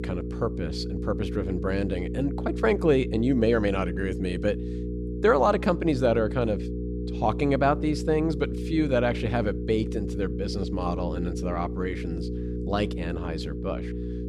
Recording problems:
electrical hum; noticeable; throughout; 60 Hz, 10 dB below the speech

